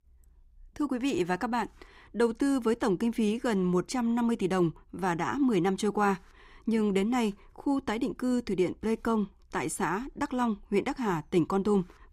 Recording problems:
none

